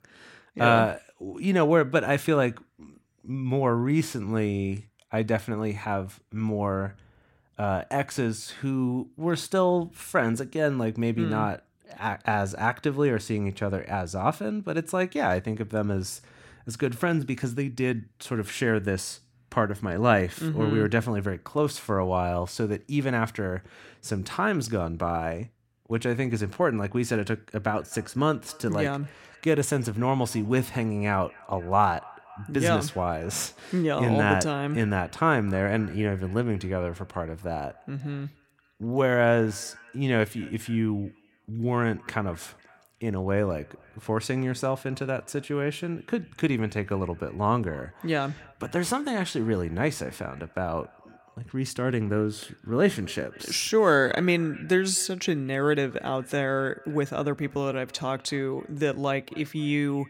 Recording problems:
echo of what is said; faint; from 28 s on; 250 ms later, 25 dB below the speech

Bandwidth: 16.5 kHz